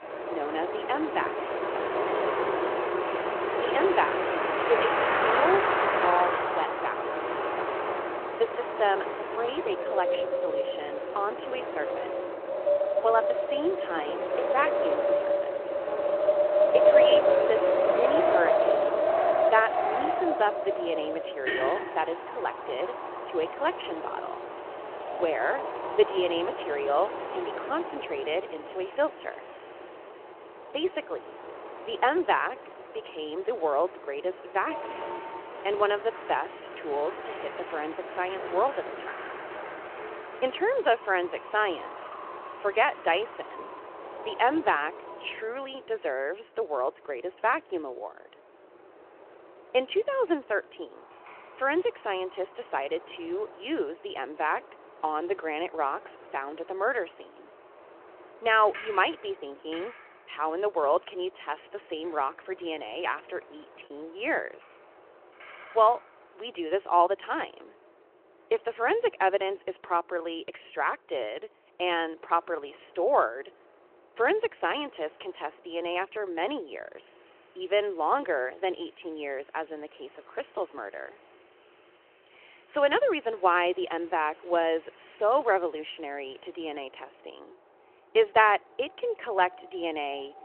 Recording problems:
phone-call audio
wind in the background; very loud; throughout; 1 dB above the speech
choppy; occasionally; at 1:04; under 1% of the speech affected

